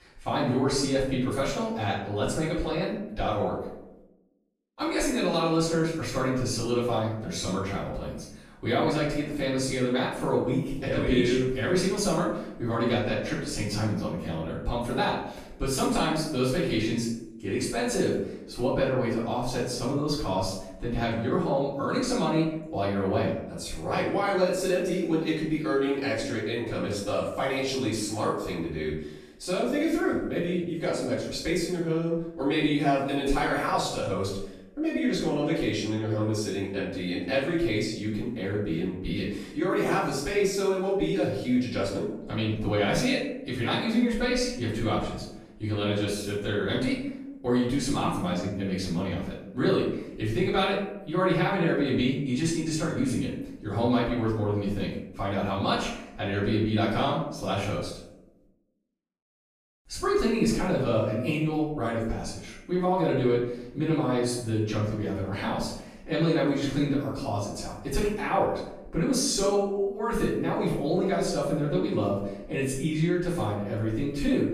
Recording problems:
off-mic speech; far
room echo; noticeable; dies away in 0.7 s

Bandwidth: 14.5 kHz